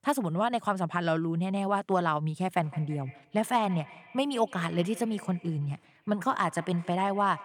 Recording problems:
echo of what is said; faint; from 2.5 s on; 160 ms later, 20 dB below the speech

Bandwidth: 18 kHz